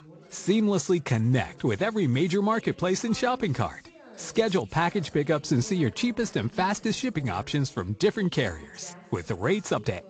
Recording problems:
garbled, watery; slightly; nothing above 7.5 kHz
background chatter; faint; throughout; 2 voices, 25 dB below the speech

